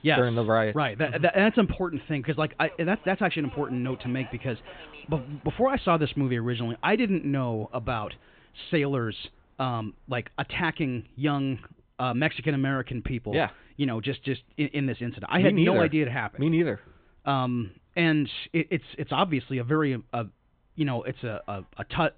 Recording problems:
high frequencies cut off; severe; nothing above 4 kHz
train or aircraft noise; faint; throughout; 25 dB below the speech

